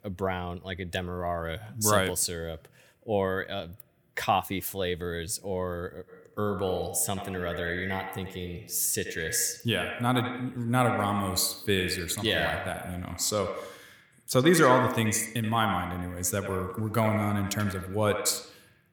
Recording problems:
echo of what is said; strong; from 6 s on; 80 ms later, 6 dB below the speech

